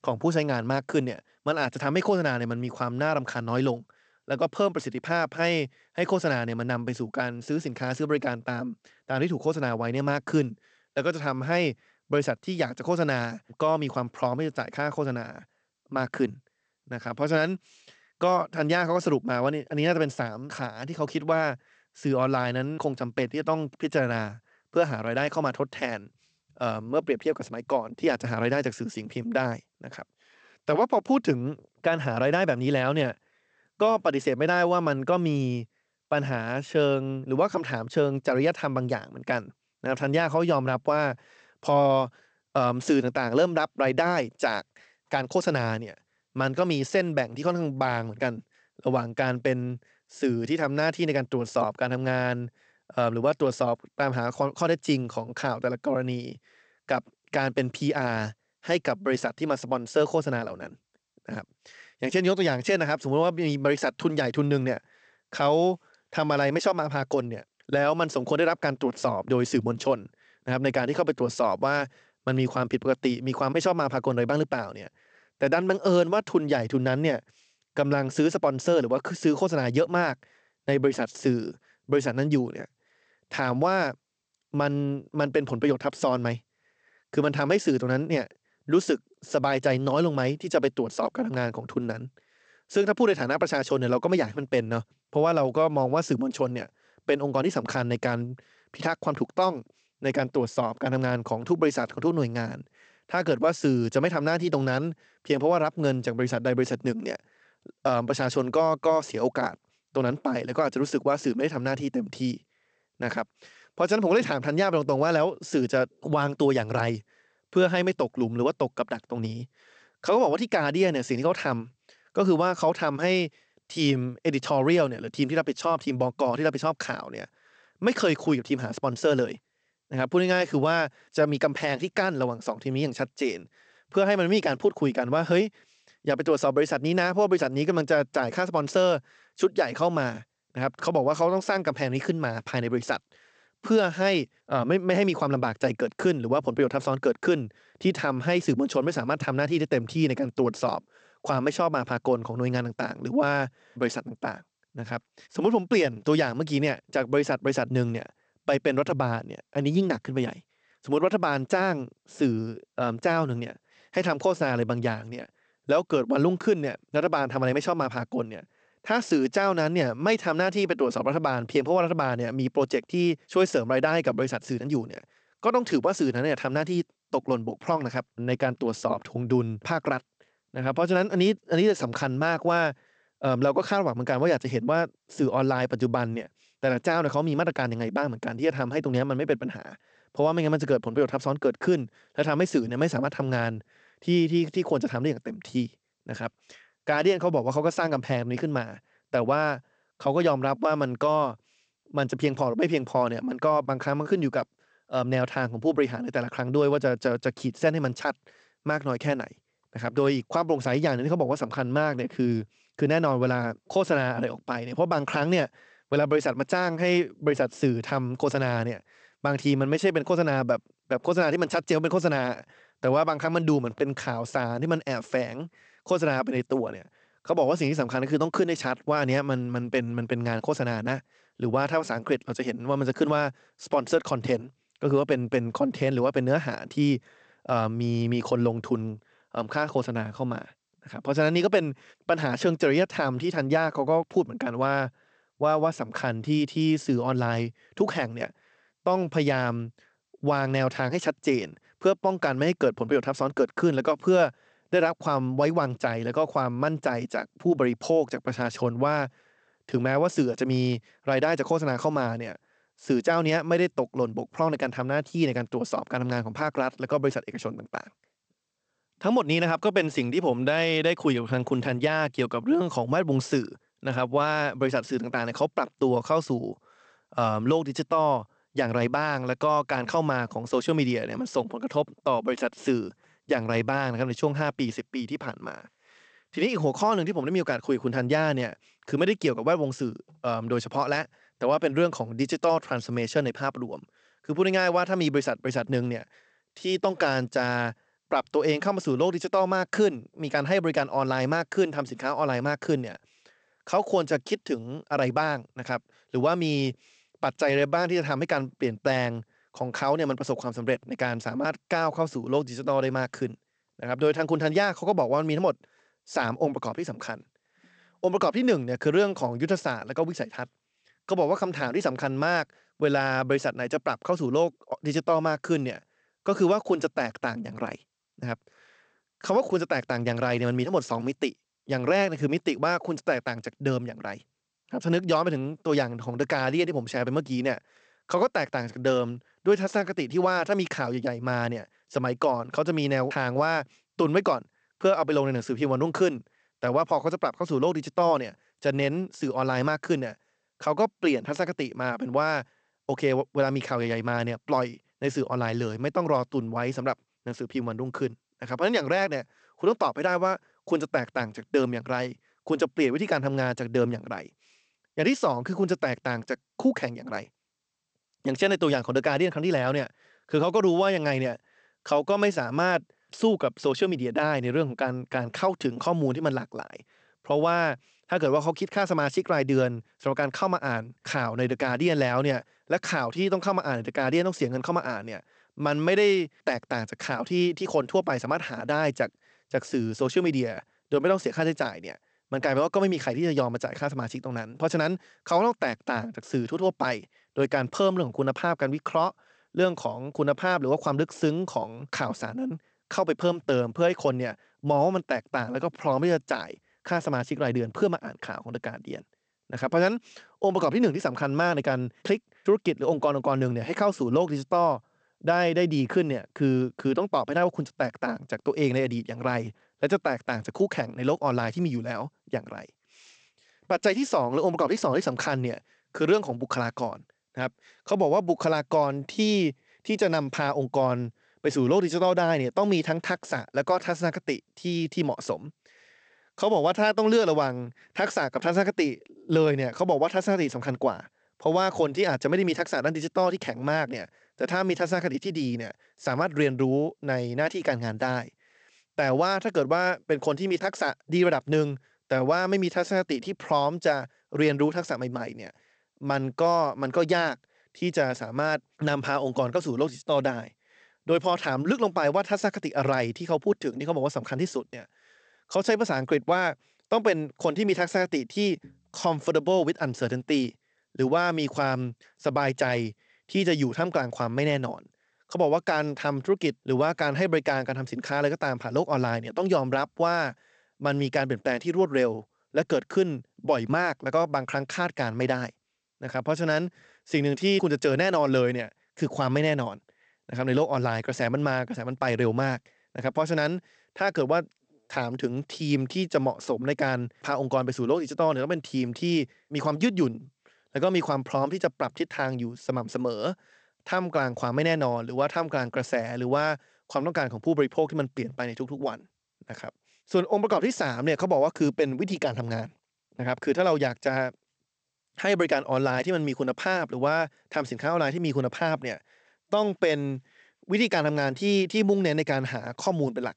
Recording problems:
garbled, watery; slightly; nothing above 8 kHz

